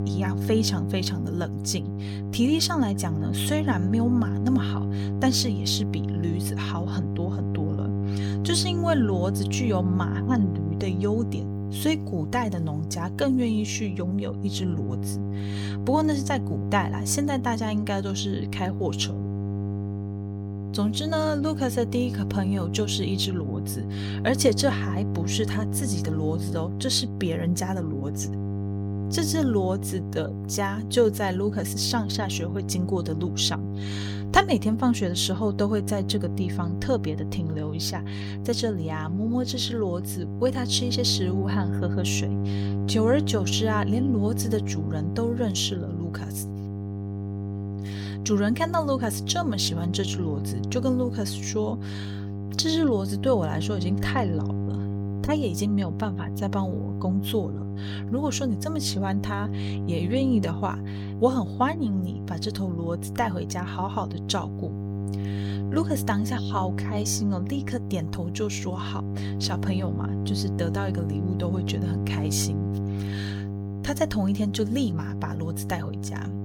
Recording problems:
electrical hum; loud; throughout; 50 Hz, 10 dB below the speech

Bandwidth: 18 kHz